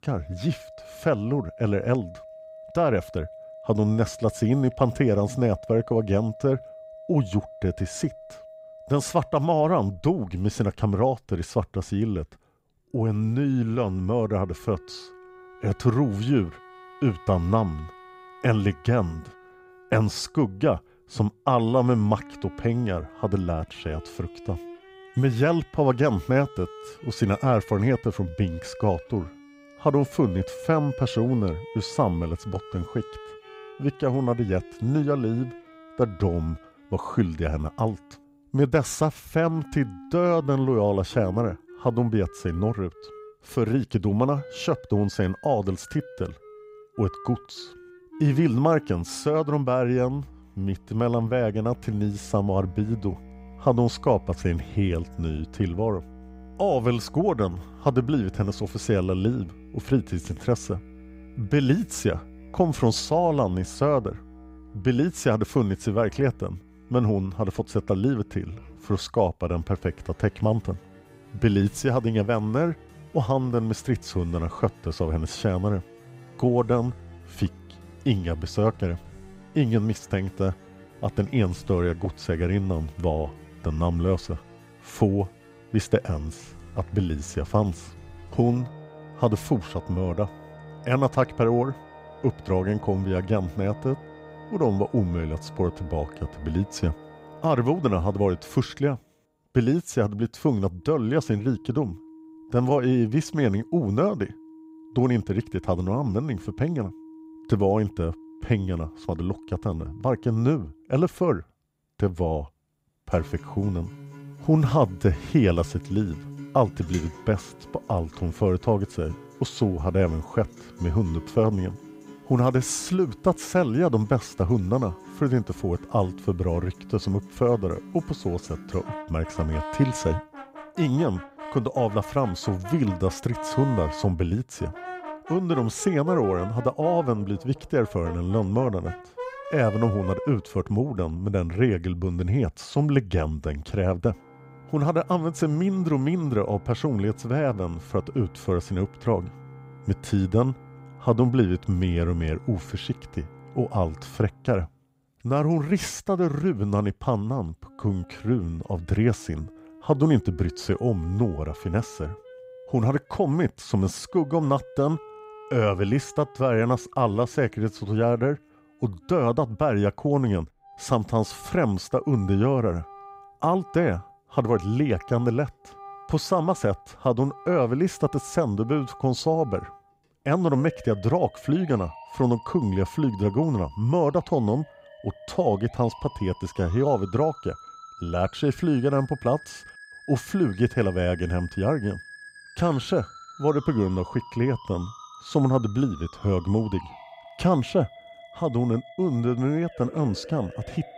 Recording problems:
background music; noticeable; throughout; 20 dB below the speech

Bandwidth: 15.5 kHz